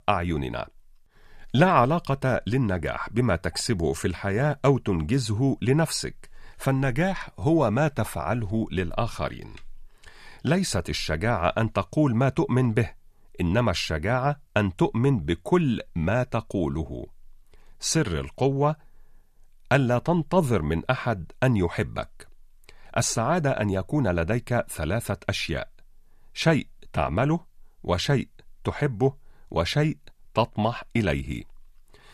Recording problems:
none

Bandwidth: 14.5 kHz